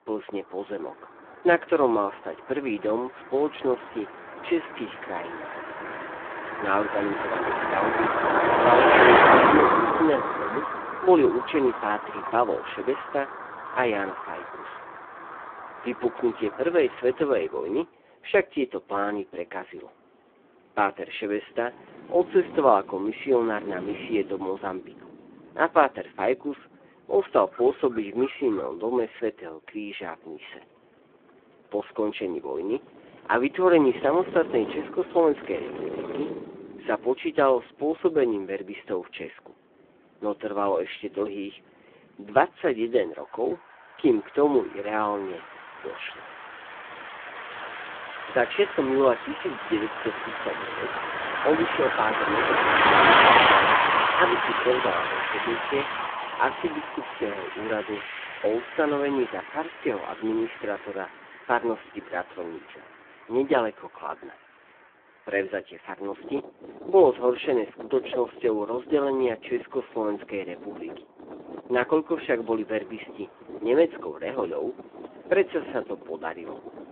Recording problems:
phone-call audio; poor line
traffic noise; very loud; throughout; 2 dB above the speech

